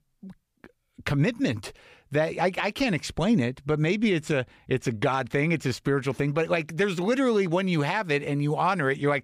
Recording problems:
none

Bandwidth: 15 kHz